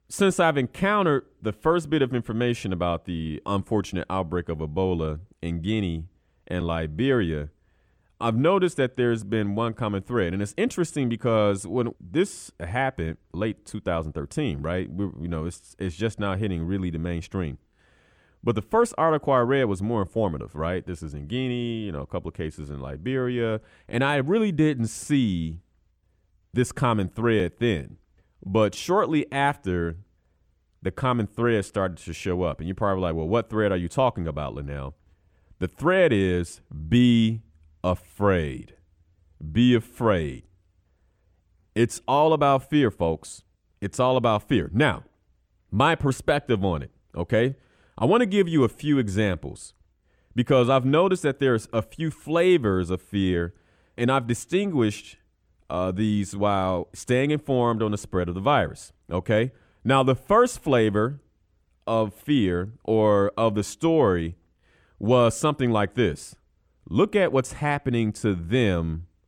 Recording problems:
muffled; slightly; fading above 3.5 kHz

